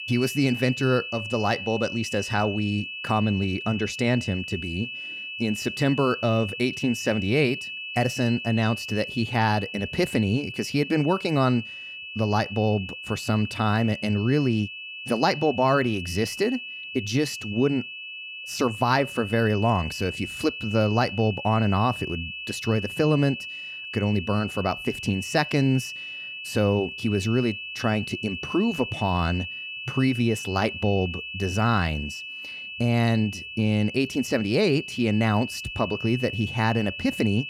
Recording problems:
high-pitched whine; loud; throughout; 2.5 kHz, 8 dB below the speech

